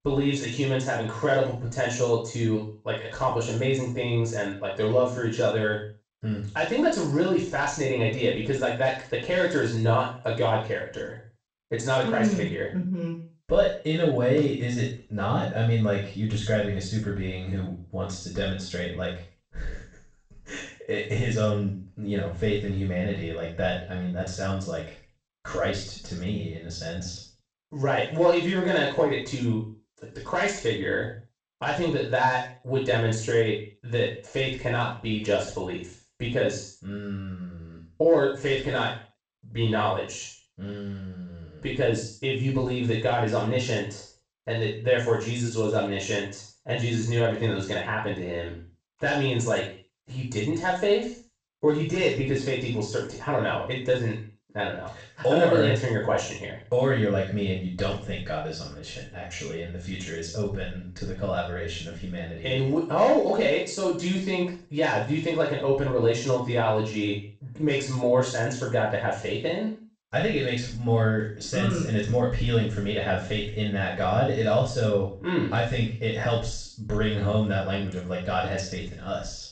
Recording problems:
off-mic speech; far
room echo; noticeable; dies away in 0.4 s
garbled, watery; slightly; nothing above 8 kHz

